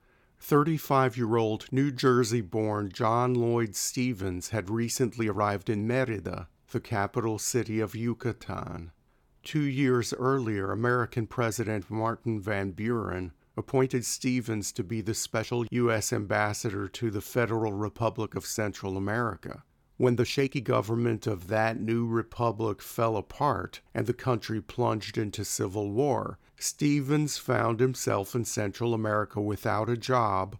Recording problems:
uneven, jittery; strongly; from 5 to 28 s

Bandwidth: 17.5 kHz